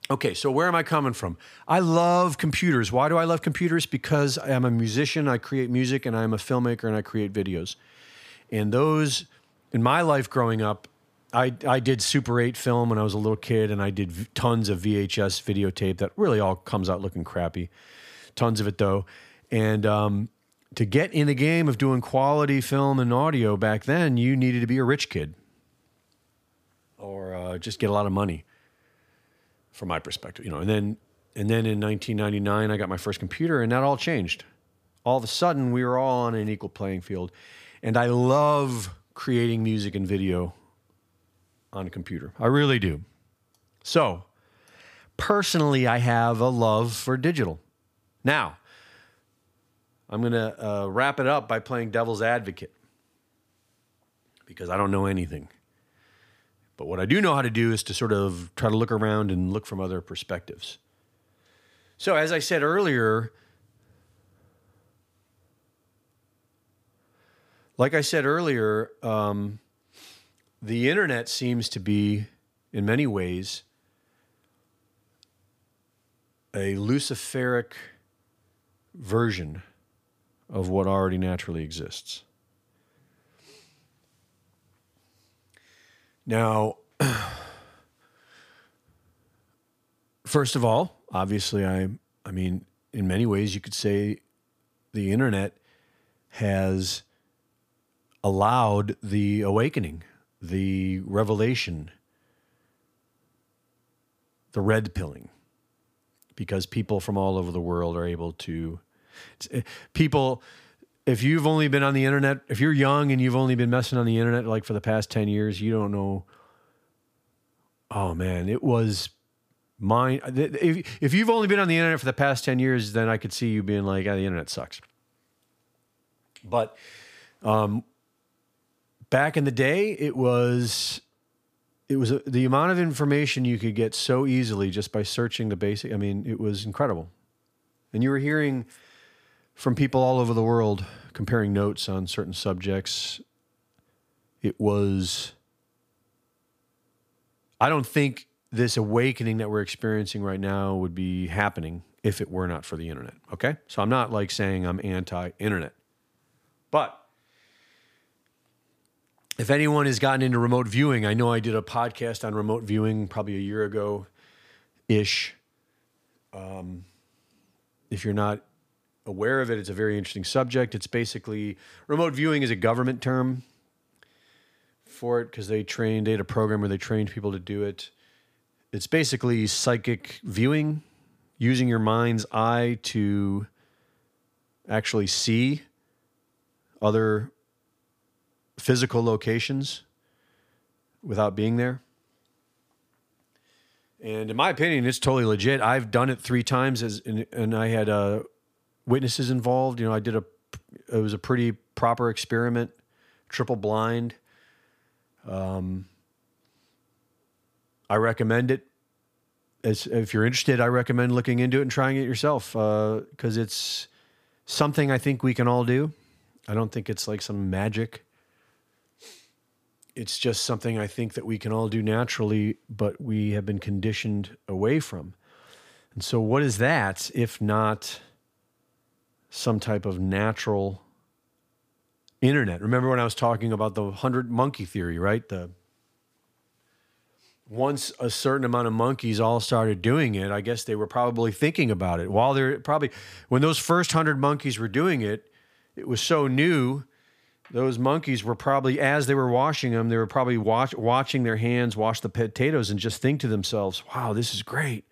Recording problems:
none

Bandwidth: 15 kHz